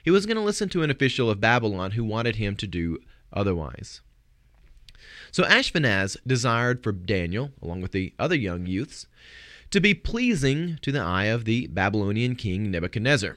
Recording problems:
none

